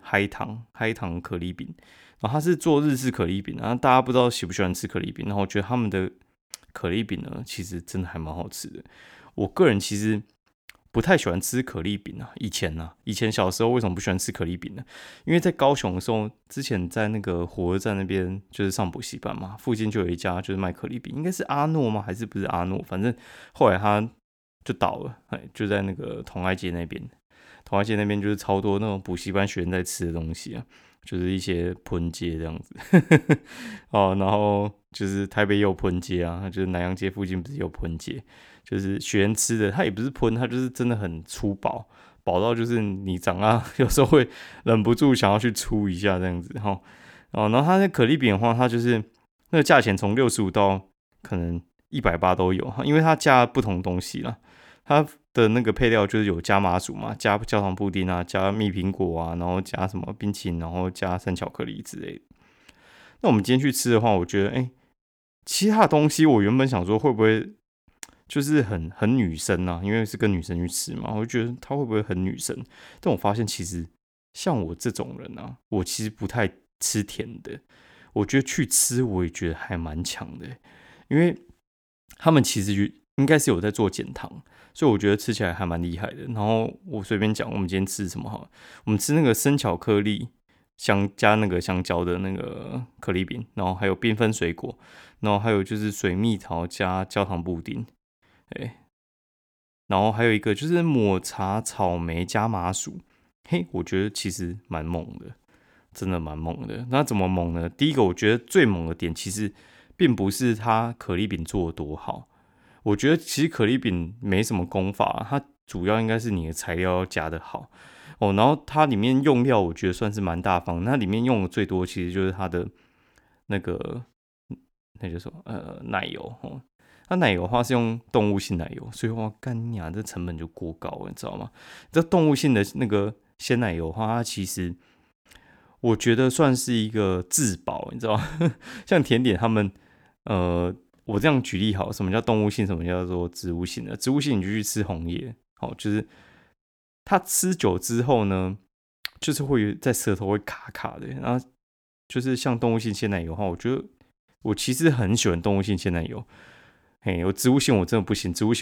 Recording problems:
abrupt cut into speech; at the end

